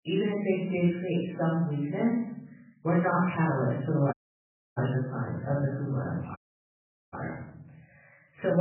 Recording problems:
off-mic speech; far
garbled, watery; badly; nothing above 3 kHz
room echo; noticeable; dies away in 0.8 s
audio cutting out; at 4 s for 0.5 s and at 6.5 s for 1 s
abrupt cut into speech; at the end

